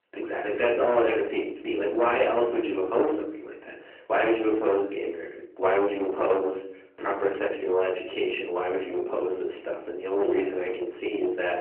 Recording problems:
distortion; heavy; 10 dB below the speech
off-mic speech; far
room echo; slight; dies away in 0.5 s
phone-call audio

